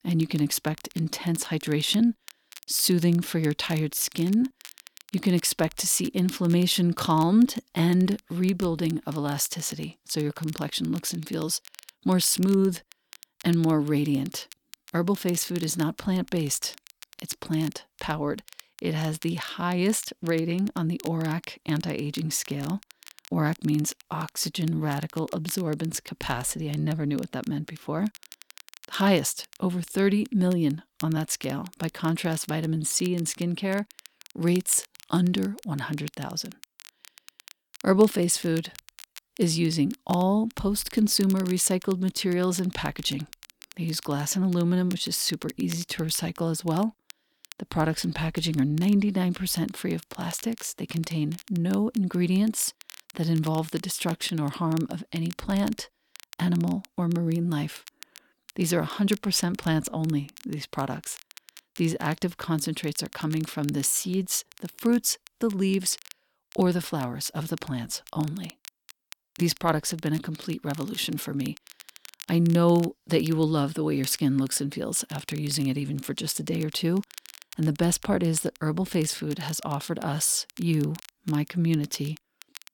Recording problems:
crackle, like an old record; faint; 20 dB below the speech

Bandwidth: 18 kHz